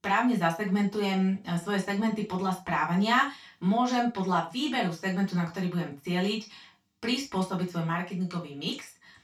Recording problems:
off-mic speech; far
room echo; slight; dies away in 0.3 s

